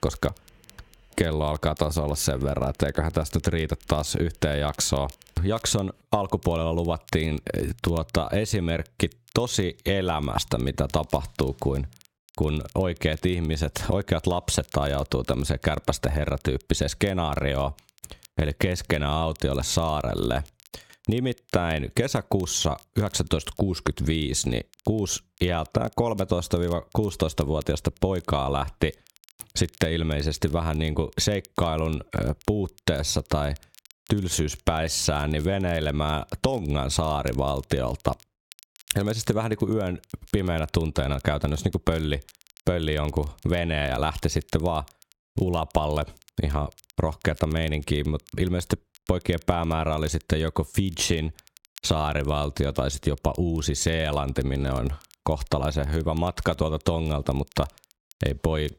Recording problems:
squashed, flat; somewhat
crackle, like an old record; faint; 25 dB below the speech

